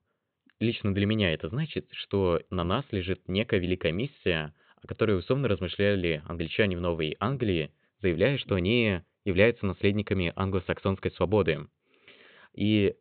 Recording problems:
high frequencies cut off; severe; nothing above 4 kHz

